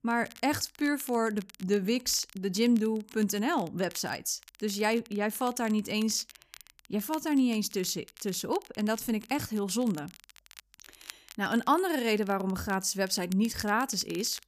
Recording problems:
crackle, like an old record; faint; 20 dB below the speech

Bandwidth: 14.5 kHz